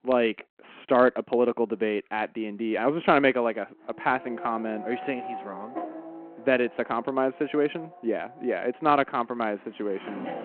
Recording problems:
phone-call audio
traffic noise; noticeable; from 4 s on; 15 dB below the speech

